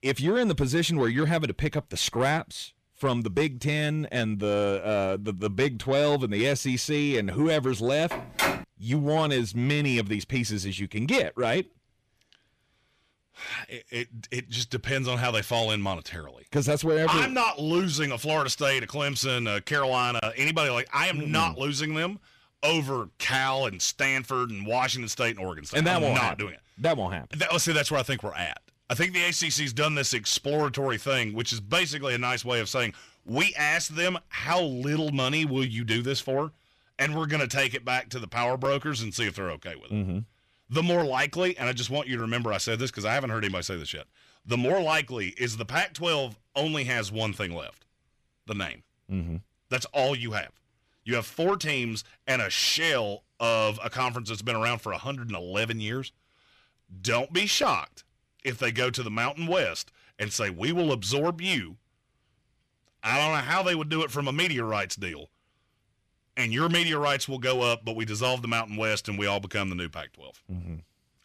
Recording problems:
distortion; slight; 10 dB below the speech
phone ringing; loud; at 8 s; peak level with the speech

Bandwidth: 14.5 kHz